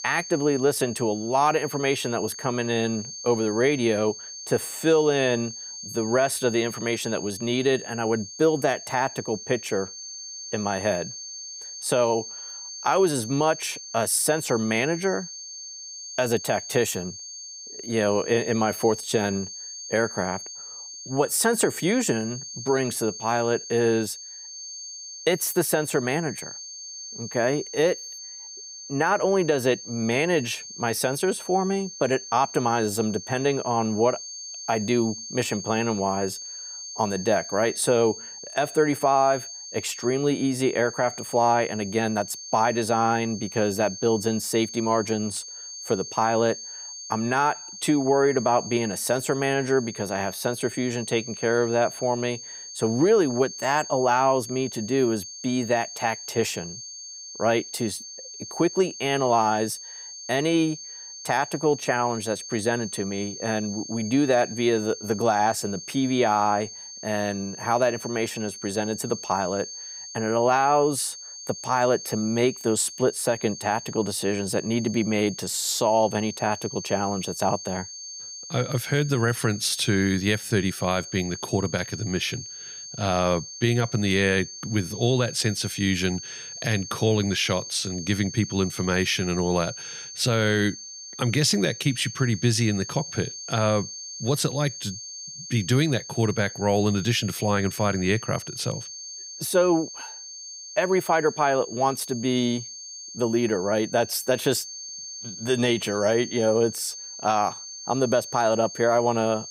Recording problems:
high-pitched whine; noticeable; throughout; 6.5 kHz, 10 dB below the speech

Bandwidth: 15.5 kHz